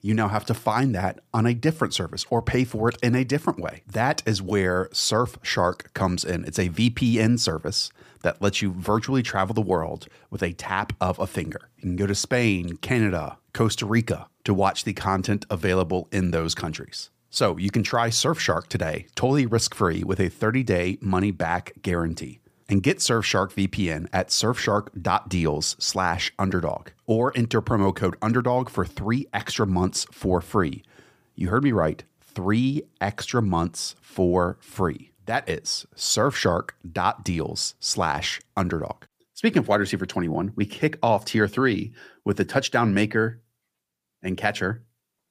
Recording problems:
none

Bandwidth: 15 kHz